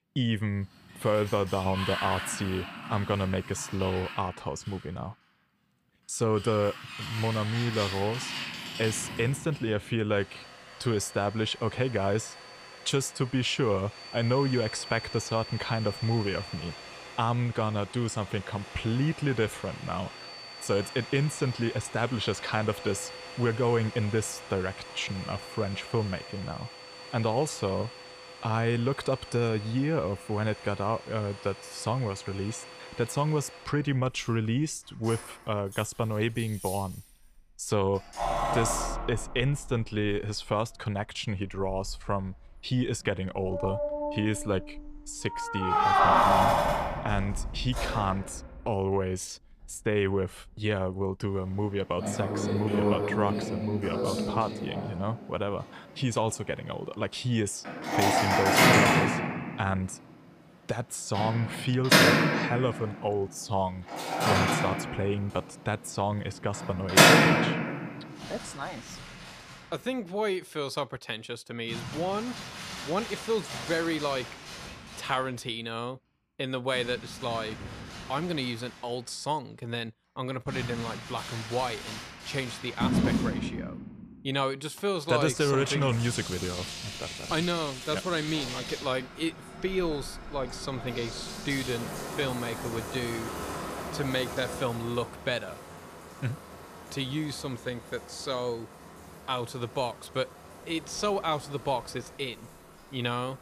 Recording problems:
household noises; very loud; throughout; 1 dB above the speech

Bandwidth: 15 kHz